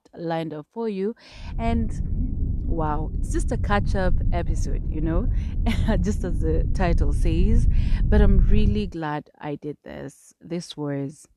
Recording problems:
low rumble; noticeable; from 1.5 to 9 s; 10 dB below the speech

